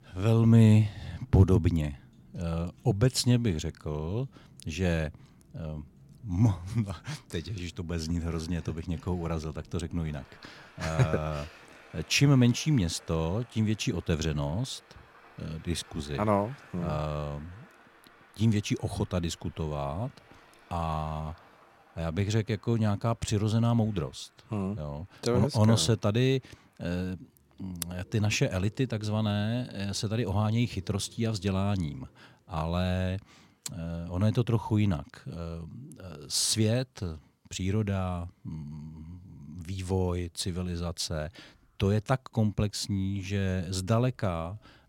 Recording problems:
traffic noise; faint; throughout; 25 dB below the speech

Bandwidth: 16.5 kHz